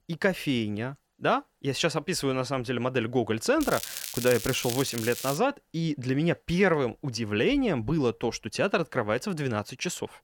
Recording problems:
crackling; loud; from 3.5 to 5.5 s; 7 dB below the speech

